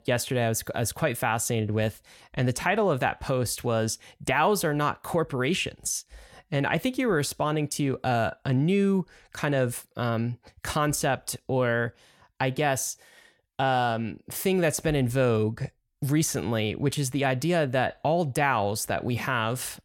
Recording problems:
none

